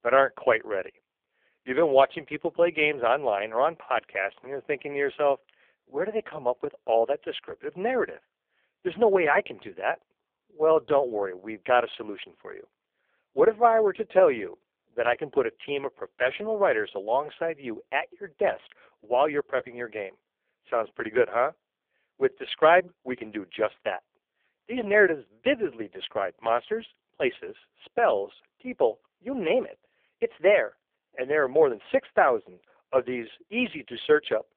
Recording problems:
phone-call audio; poor line; nothing above 3.5 kHz

